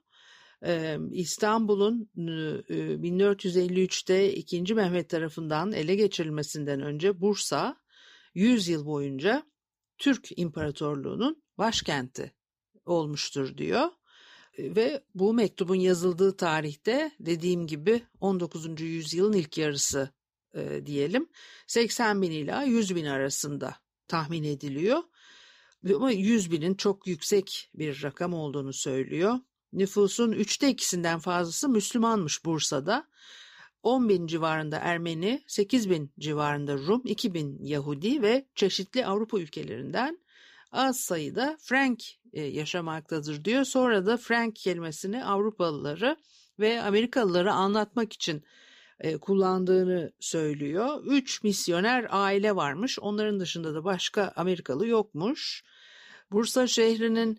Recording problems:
none

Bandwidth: 15 kHz